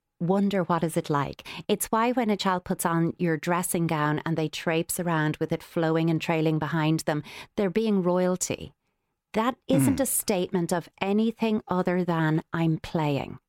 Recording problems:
none

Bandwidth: 16.5 kHz